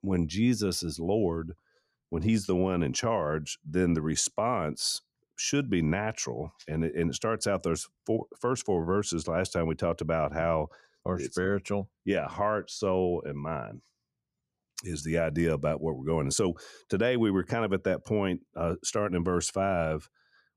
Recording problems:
none

